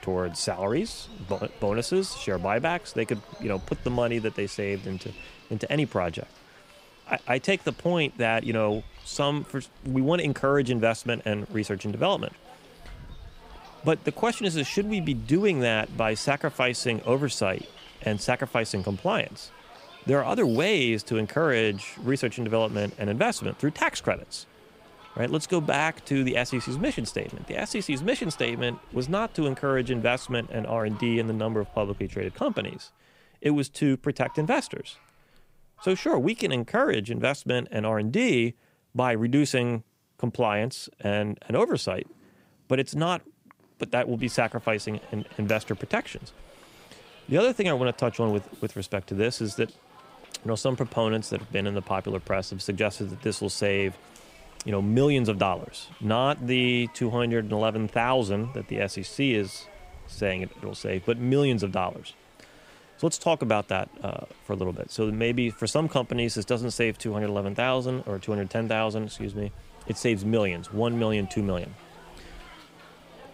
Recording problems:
animal sounds; faint; throughout; 25 dB below the speech
hiss; faint; until 32 s and from 44 s on; 25 dB below the speech

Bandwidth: 15.5 kHz